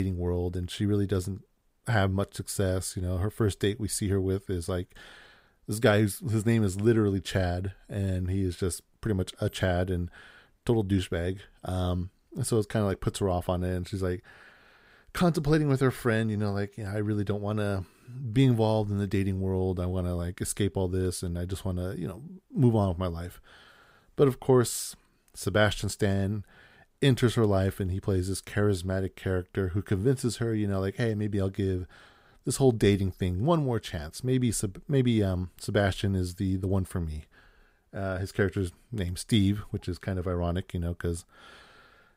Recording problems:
abrupt cut into speech; at the start

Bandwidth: 15.5 kHz